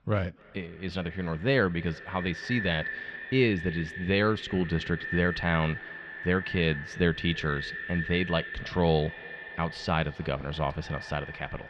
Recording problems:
echo of what is said; strong; throughout; 280 ms later, 9 dB below the speech
muffled; slightly; fading above 3.5 kHz

